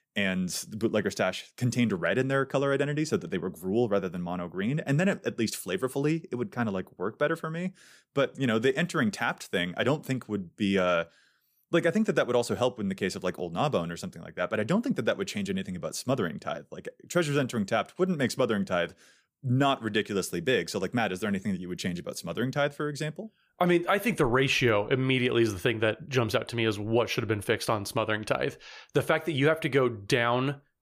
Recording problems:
none

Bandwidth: 15 kHz